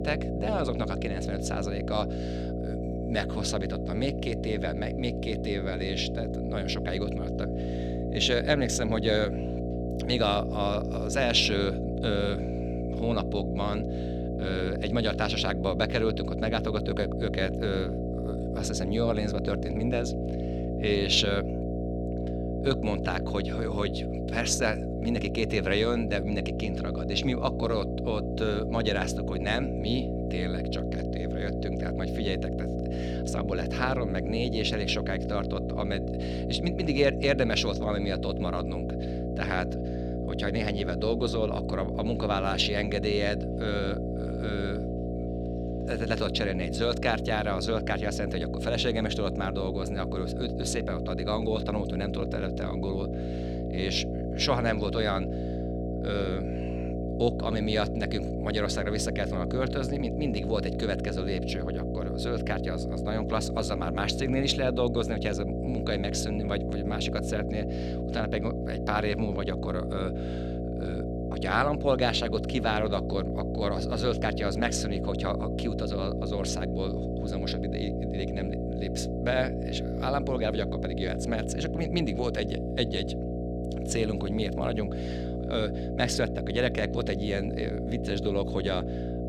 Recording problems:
electrical hum; loud; throughout; 60 Hz, 5 dB below the speech

